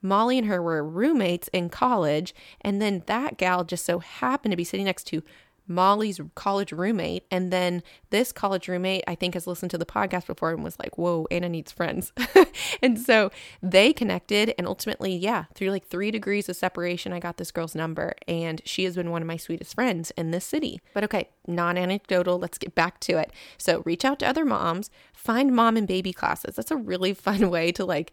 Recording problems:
none

